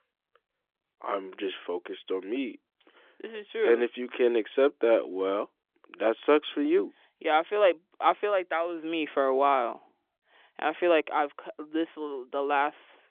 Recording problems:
phone-call audio; nothing above 3.5 kHz

